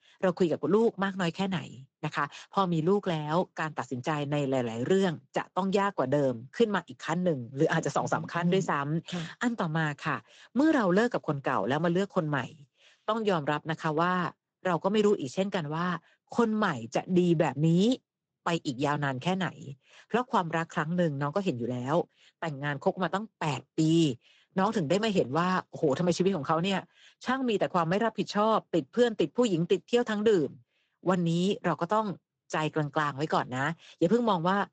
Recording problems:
garbled, watery; slightly; nothing above 7.5 kHz

